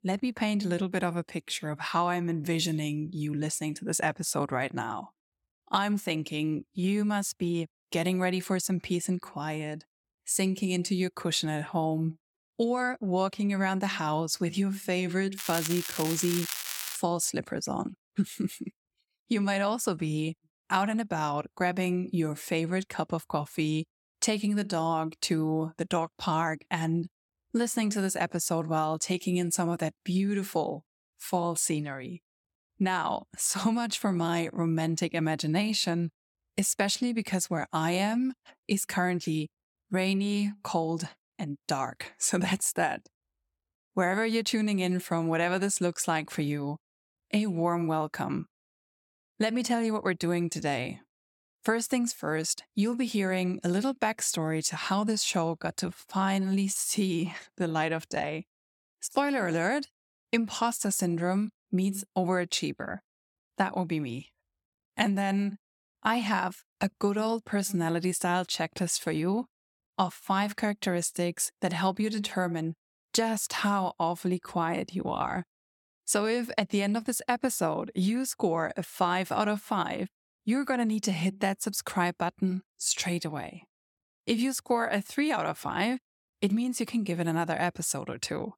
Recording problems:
crackling; loud; from 15 to 17 s; 4 dB below the speech

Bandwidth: 17.5 kHz